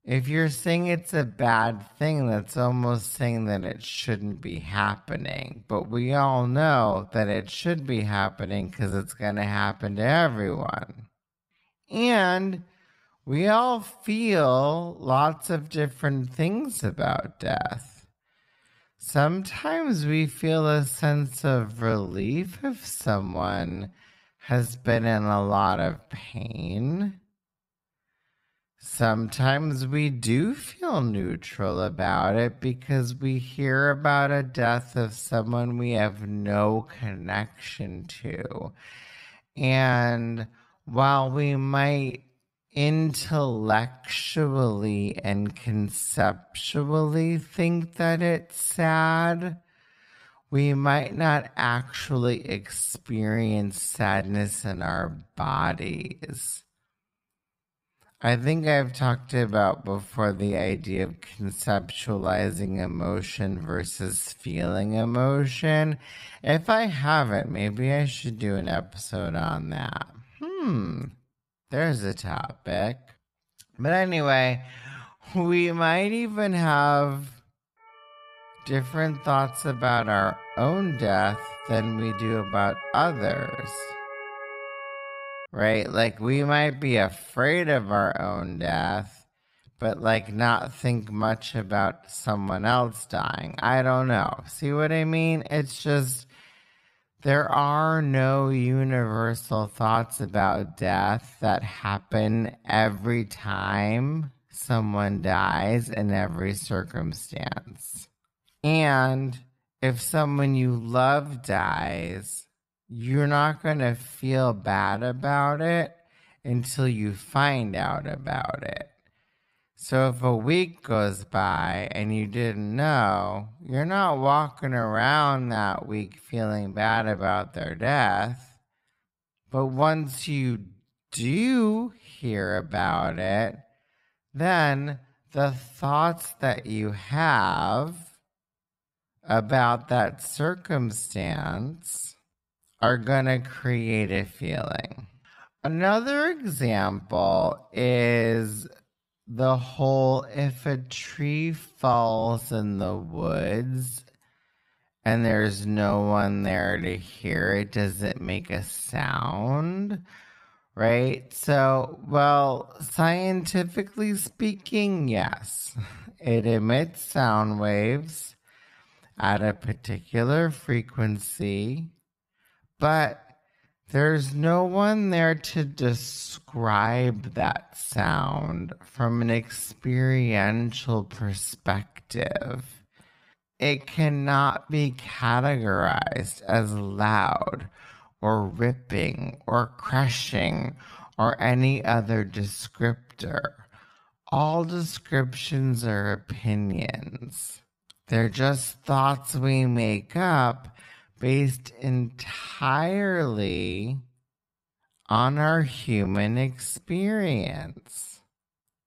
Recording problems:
wrong speed, natural pitch; too slow; 0.5 times normal speed
siren; noticeable; from 1:18 to 1:25; peak 9 dB below the speech

